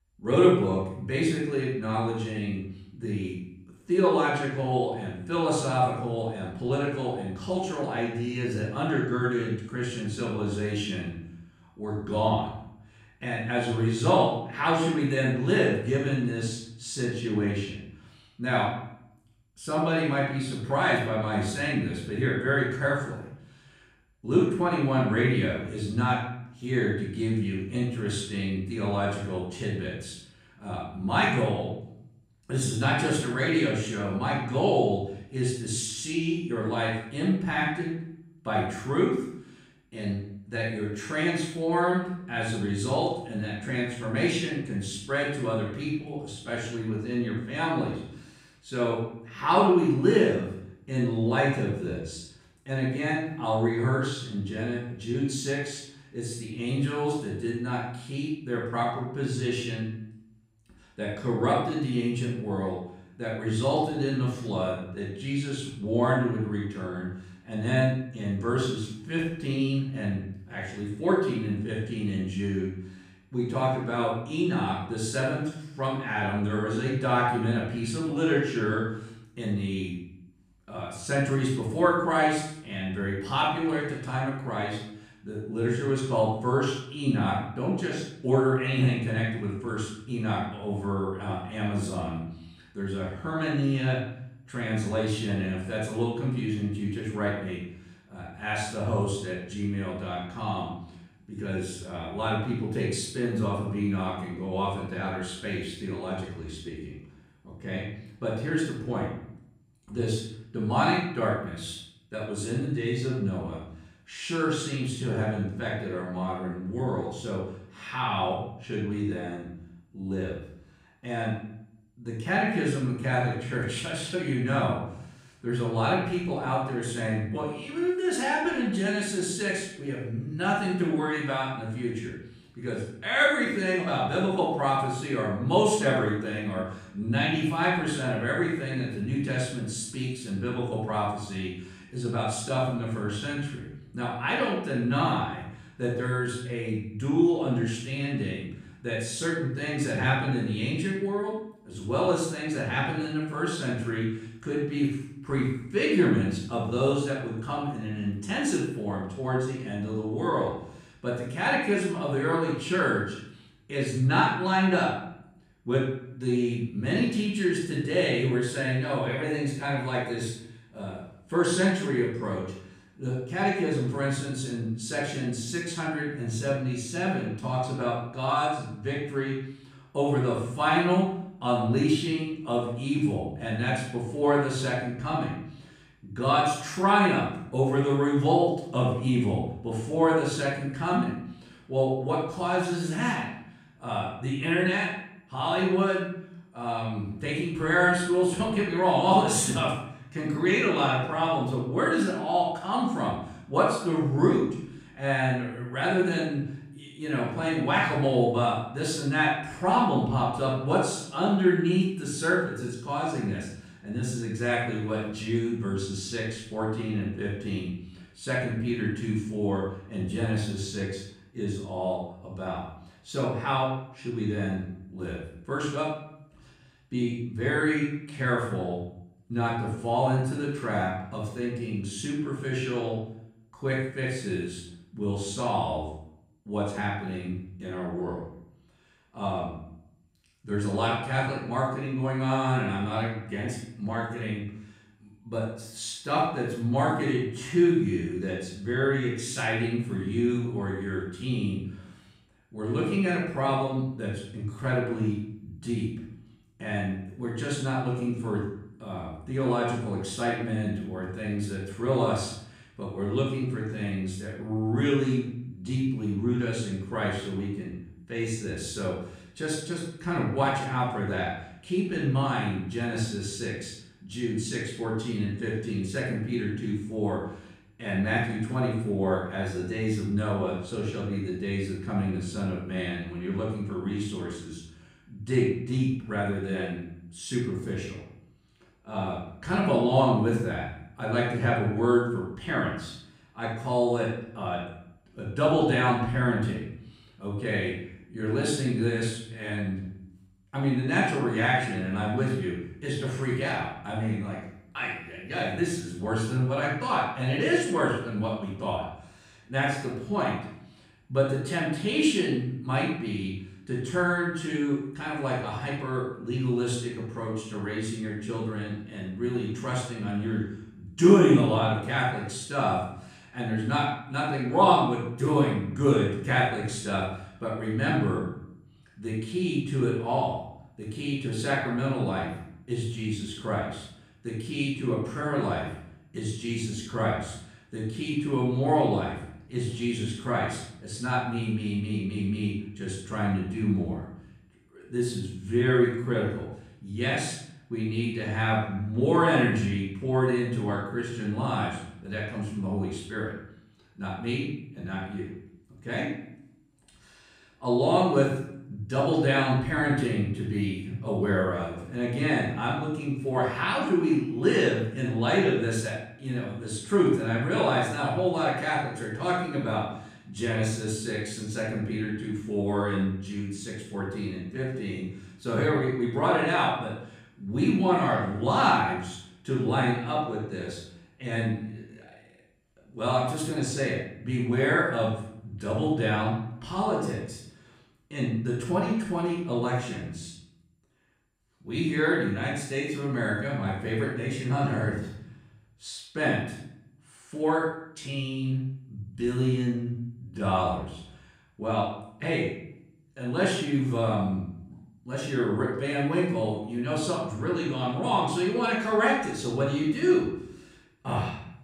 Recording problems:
off-mic speech; far
room echo; noticeable; dies away in 0.7 s

